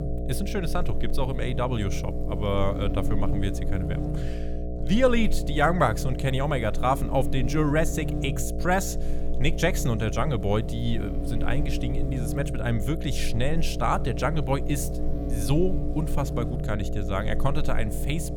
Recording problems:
electrical hum; loud; throughout; 60 Hz, 9 dB below the speech

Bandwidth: 19 kHz